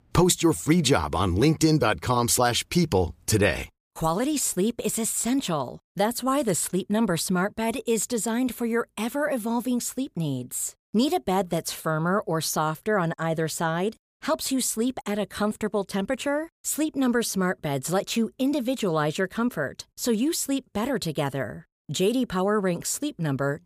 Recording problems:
none

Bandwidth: 15 kHz